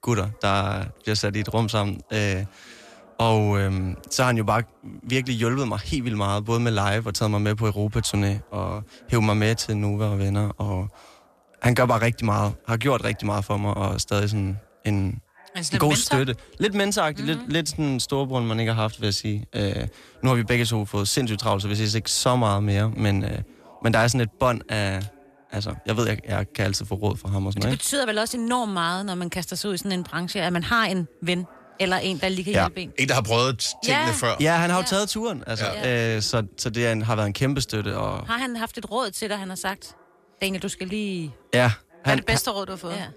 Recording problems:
voice in the background; faint; throughout; 30 dB below the speech

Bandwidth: 14.5 kHz